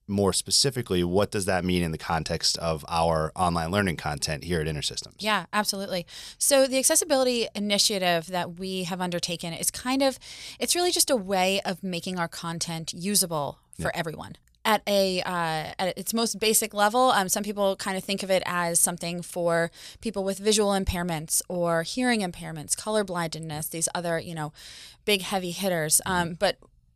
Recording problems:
none

